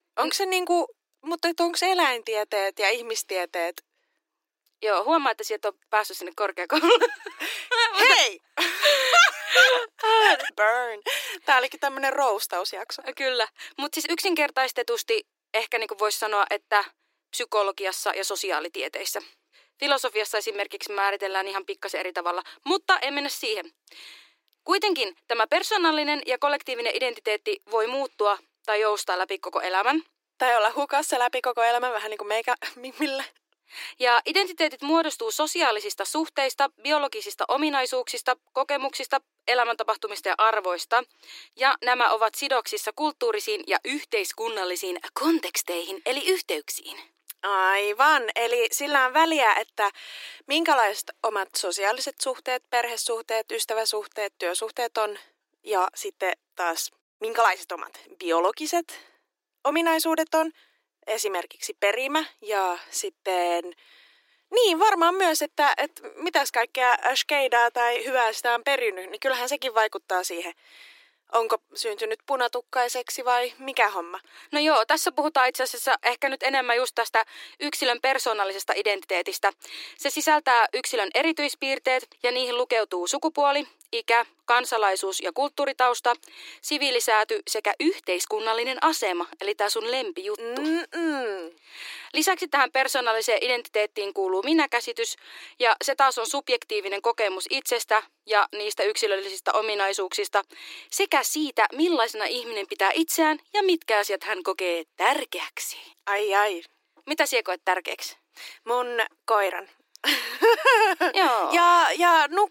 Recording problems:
thin; very; fading below 300 Hz

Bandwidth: 16 kHz